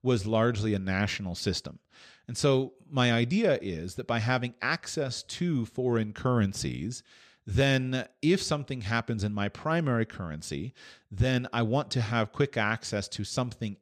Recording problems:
none

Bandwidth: 14 kHz